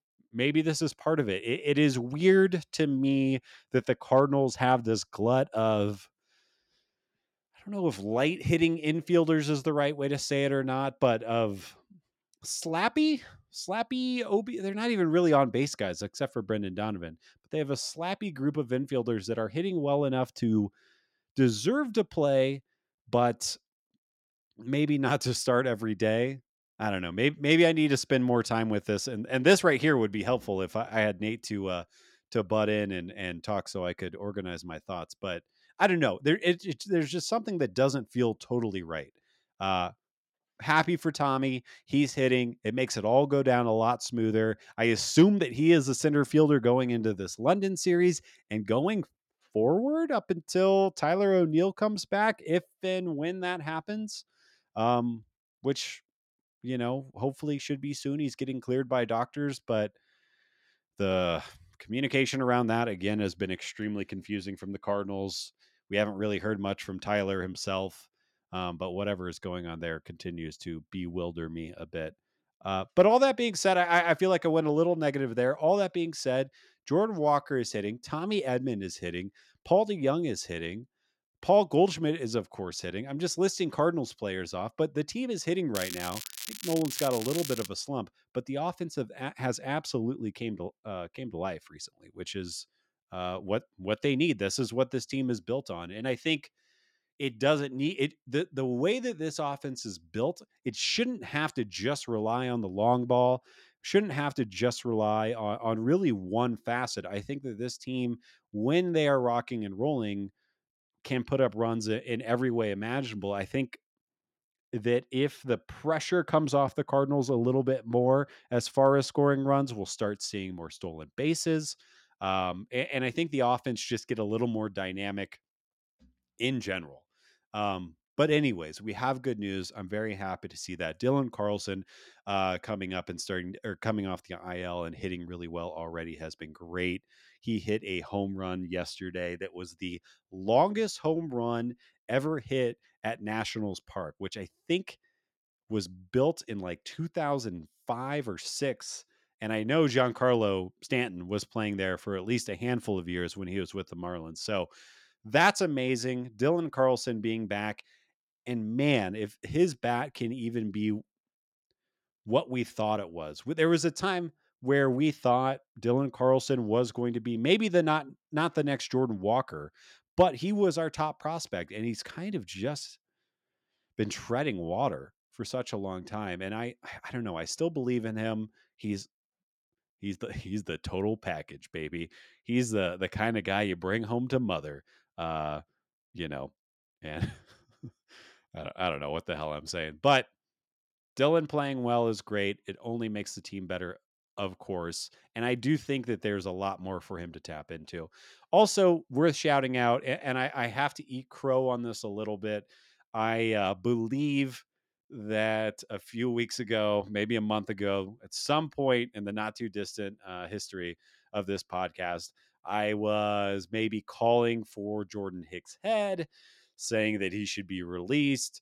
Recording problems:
crackling; loud; from 1:26 to 1:28; 8 dB below the speech

